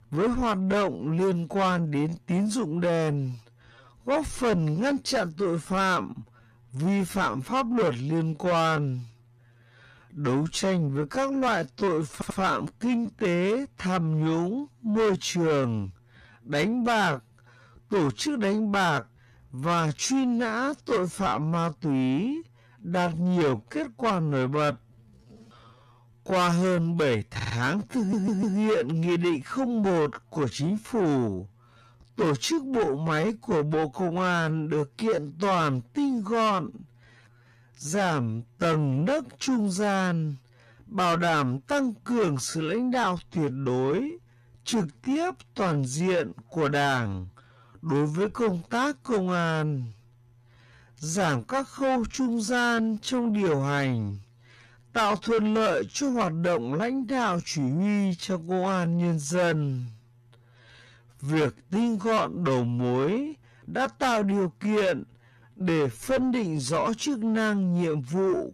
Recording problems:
distortion; heavy; 8 dB below the speech
wrong speed, natural pitch; too slow; 0.5 times normal speed
audio stuttering; at 12 s, at 27 s and at 28 s

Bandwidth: 14 kHz